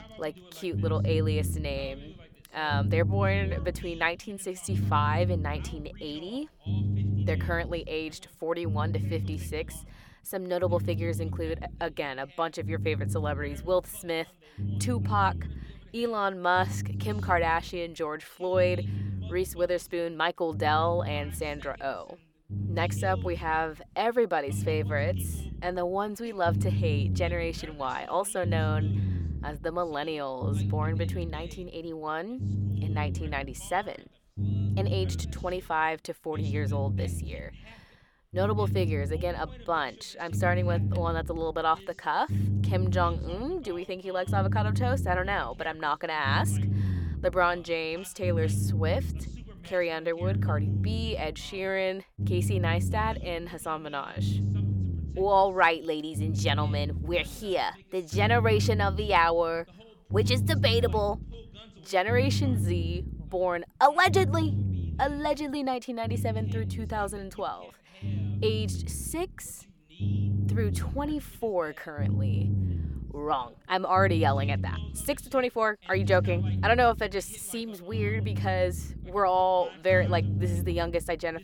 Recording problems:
low rumble; noticeable; throughout; 15 dB below the speech
voice in the background; faint; throughout; 25 dB below the speech

